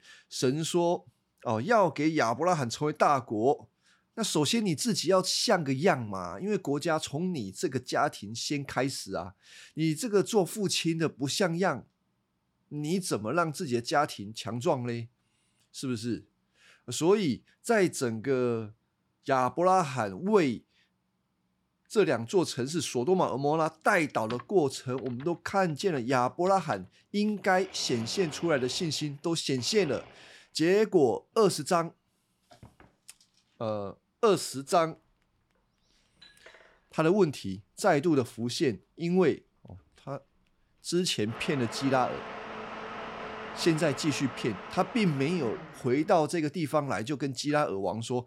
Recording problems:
household noises; noticeable; from 23 s on; 15 dB below the speech

